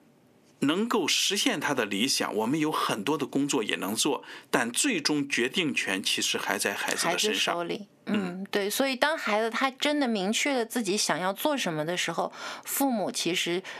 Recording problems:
thin; very slightly; fading below 300 Hz
squashed, flat; somewhat

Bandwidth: 14.5 kHz